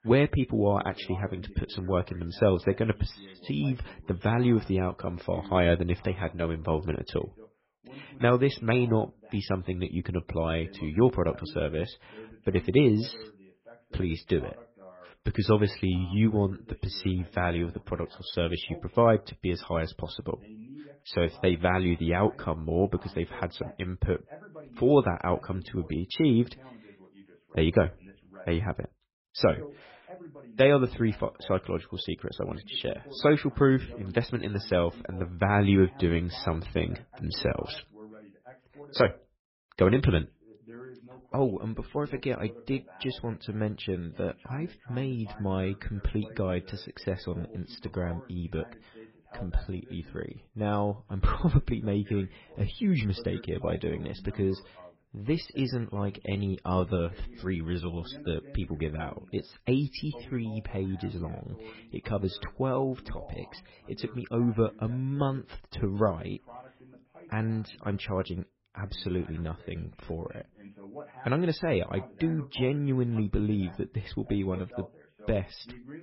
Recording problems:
garbled, watery; badly; nothing above 5.5 kHz
voice in the background; faint; throughout; 20 dB below the speech

